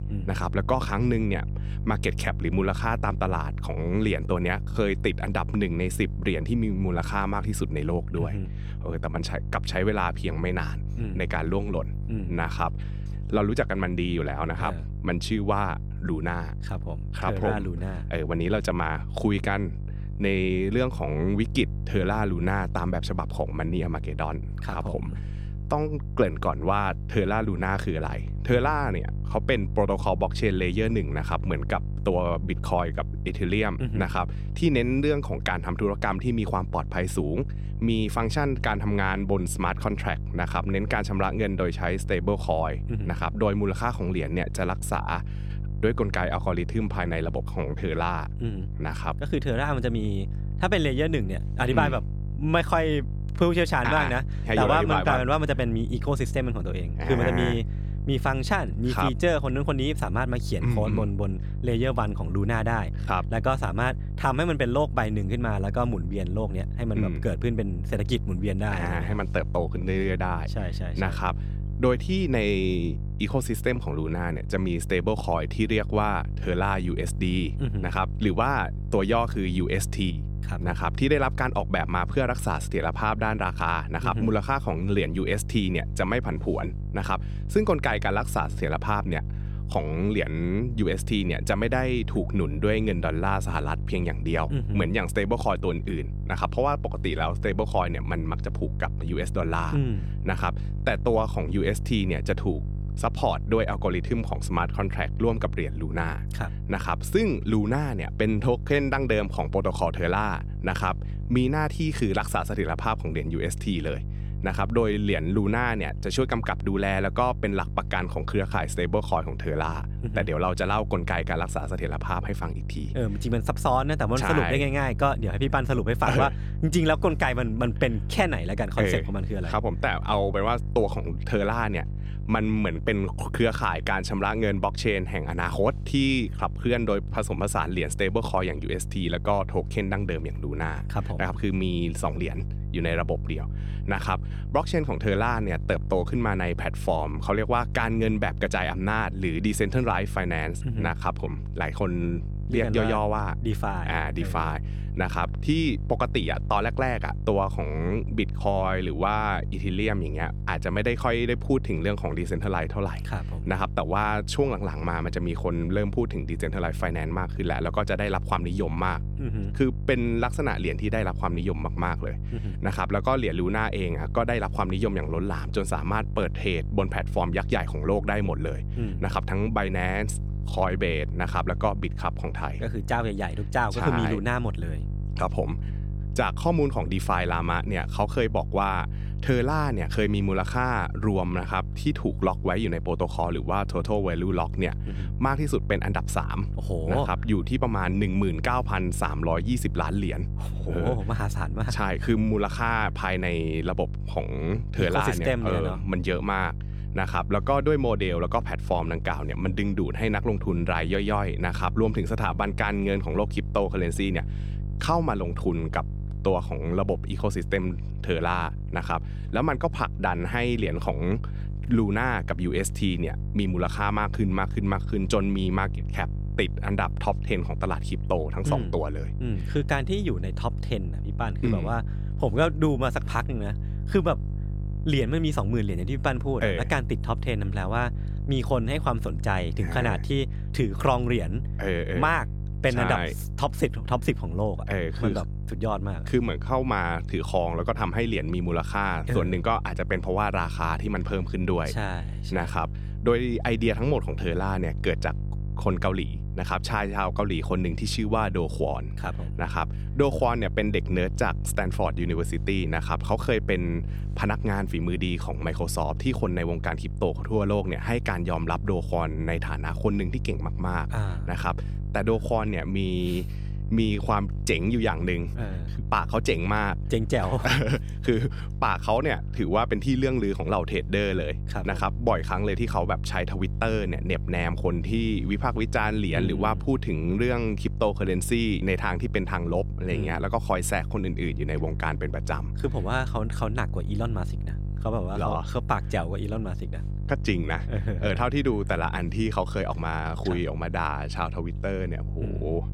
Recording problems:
electrical hum; noticeable; throughout; 50 Hz, 20 dB below the speech

